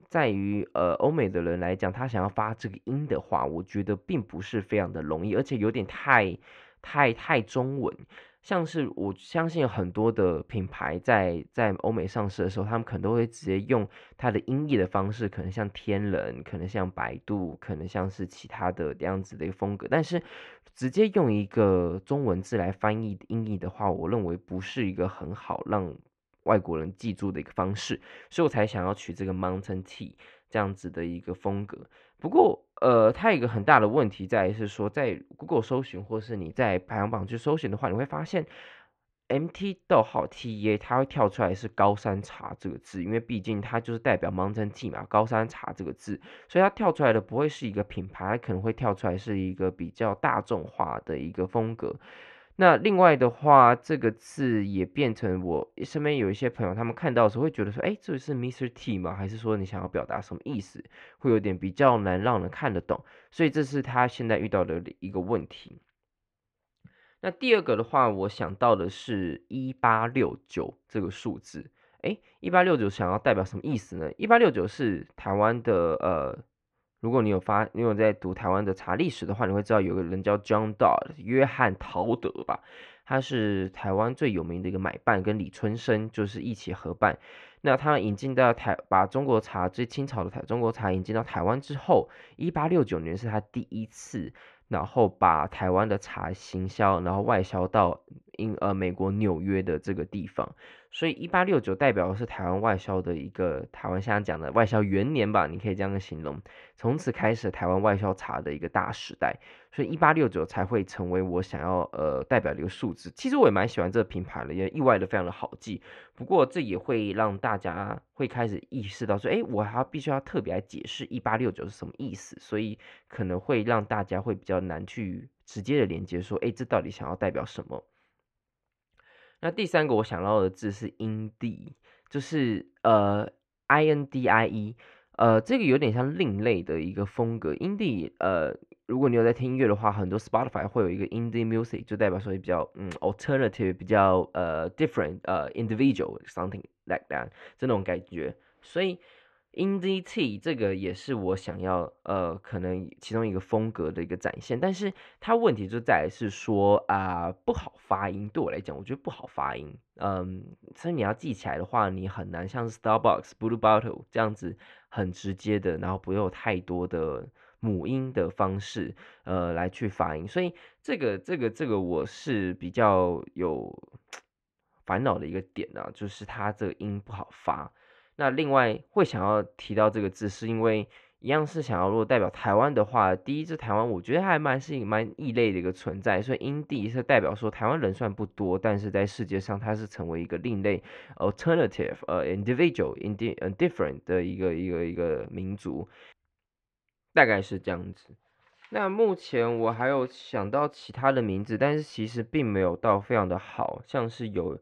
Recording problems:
muffled; very; fading above 2.5 kHz

